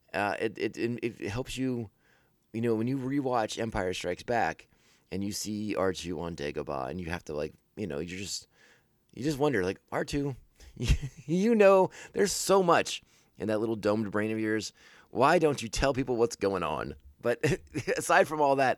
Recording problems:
none

